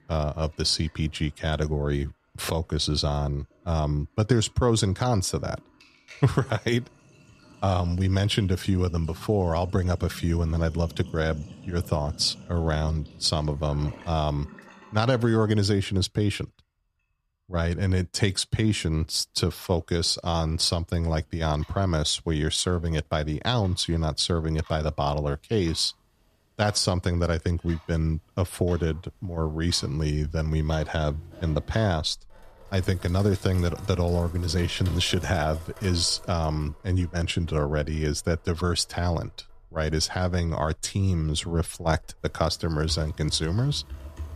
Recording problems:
household noises; faint; throughout; 20 dB below the speech

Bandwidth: 14.5 kHz